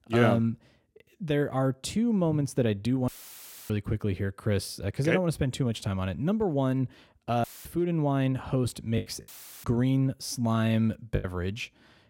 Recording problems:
audio cutting out; filled with static; at 3 s for 0.5 s, at 7.5 s and at 9.5 s
choppy; very; from 9 to 11 s; 8% of the speech affected

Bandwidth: 16.5 kHz